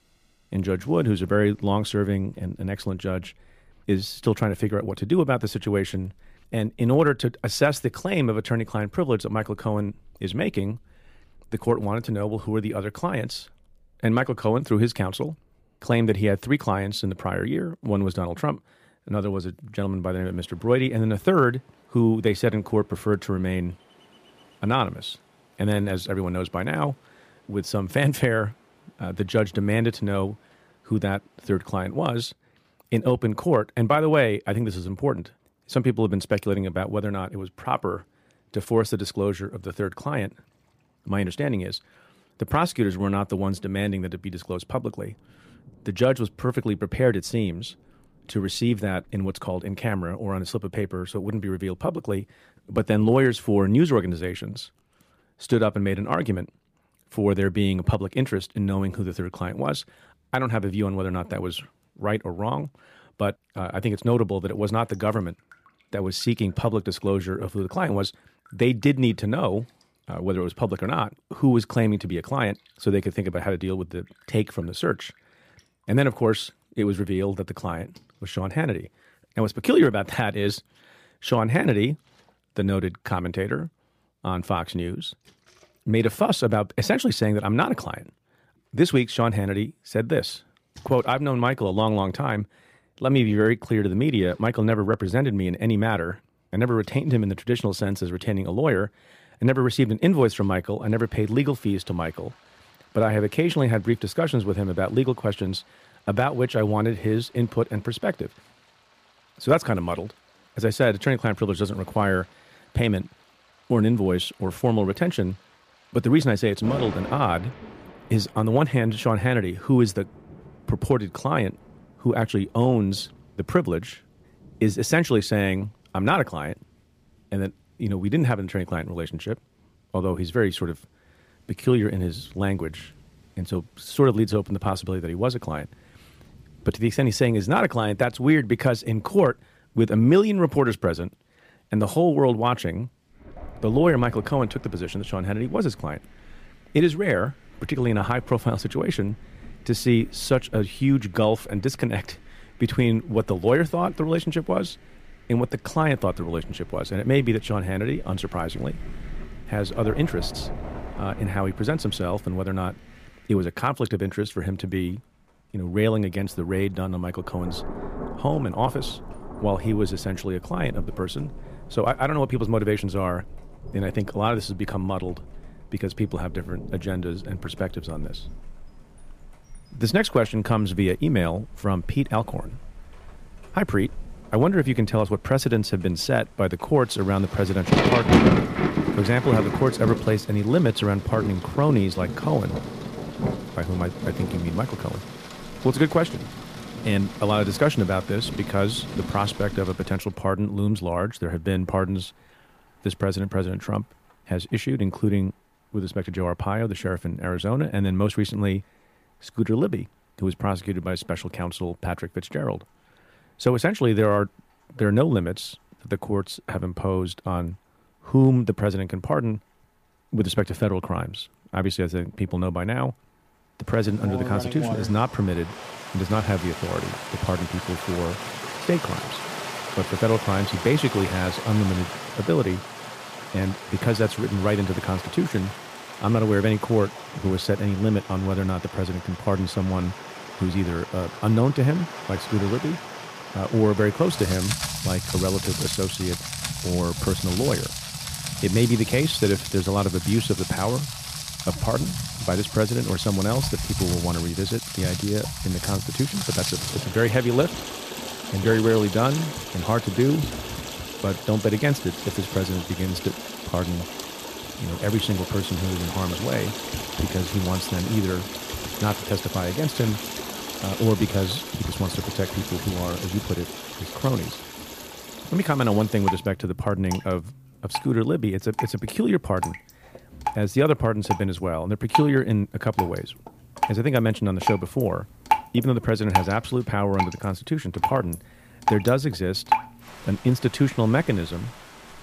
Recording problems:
rain or running water; loud; throughout; 7 dB below the speech

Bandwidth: 15 kHz